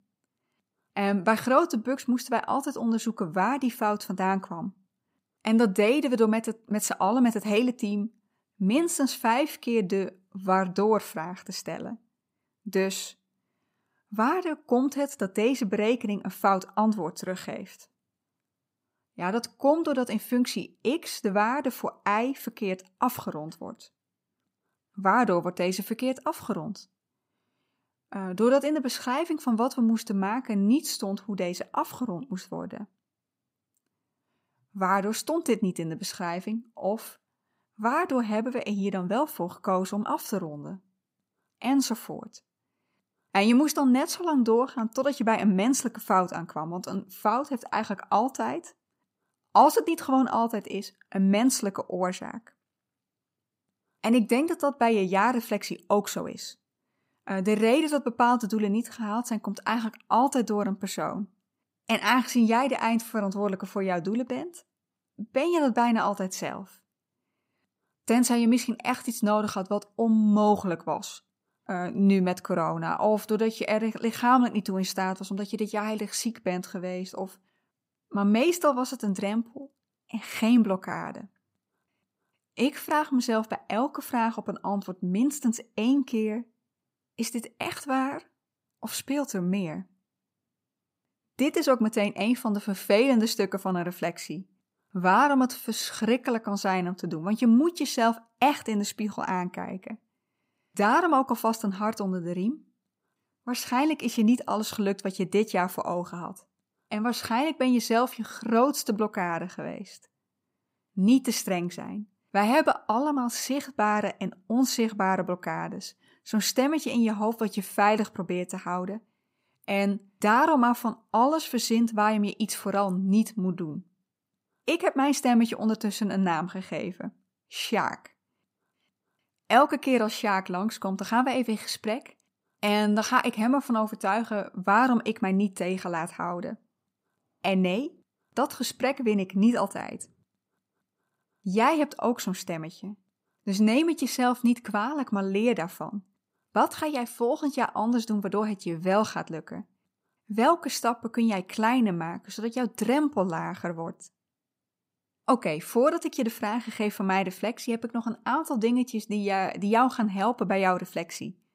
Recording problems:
none

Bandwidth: 15.5 kHz